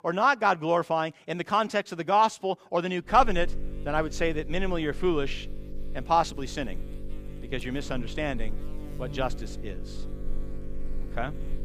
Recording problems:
electrical hum; faint; from 3 s on; 50 Hz, 20 dB below the speech

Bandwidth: 15 kHz